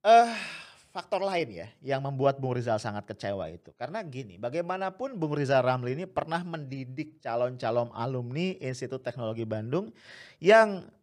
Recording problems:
none

